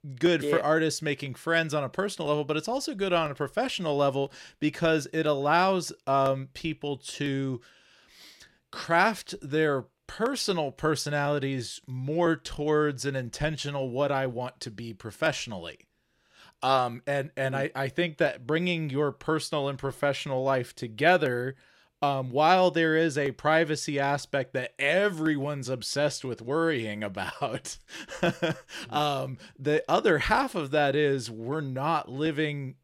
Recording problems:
none

